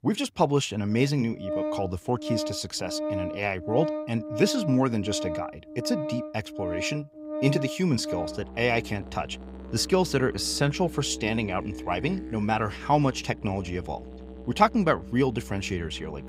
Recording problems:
background music; loud; throughout; 8 dB below the speech

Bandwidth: 15.5 kHz